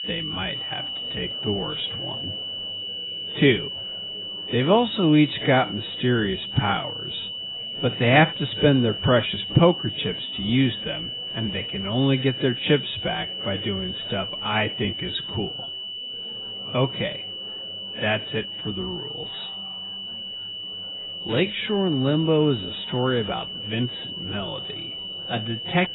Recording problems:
garbled, watery; badly; nothing above 4 kHz
wrong speed, natural pitch; too slow; 0.6 times normal speed
high-pitched whine; loud; throughout; 3 kHz, 6 dB below the speech
chatter from many people; faint; throughout; 25 dB below the speech

